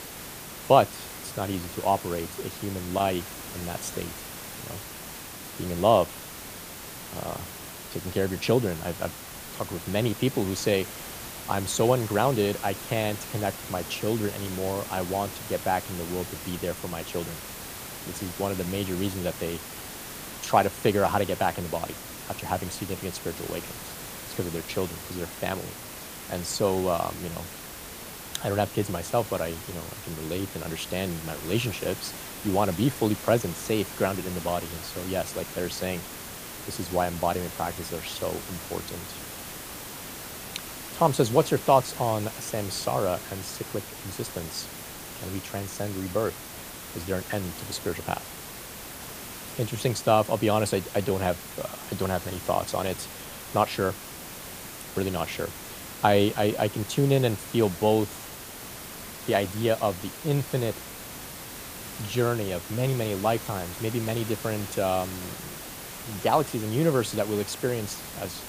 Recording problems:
hiss; loud; throughout; 9 dB below the speech

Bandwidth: 15 kHz